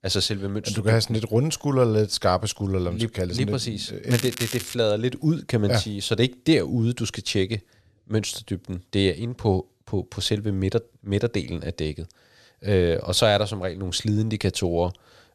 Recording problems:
crackling; loud; at 4 s; 8 dB below the speech

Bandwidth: 13.5 kHz